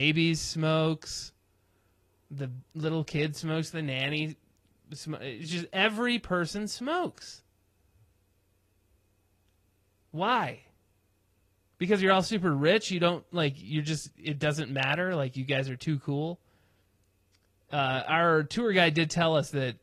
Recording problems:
garbled, watery; slightly
abrupt cut into speech; at the start

